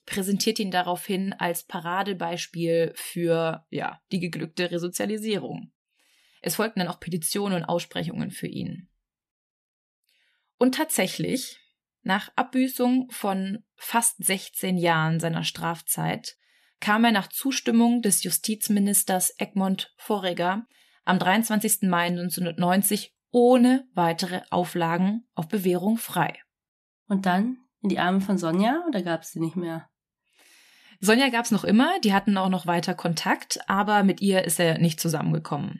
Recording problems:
none

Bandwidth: 13.5 kHz